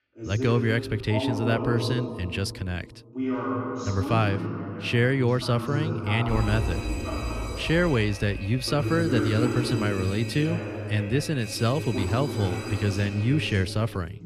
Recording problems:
voice in the background; loud; throughout; 5 dB below the speech
alarm; noticeable; from 6.5 s on; peak 5 dB below the speech

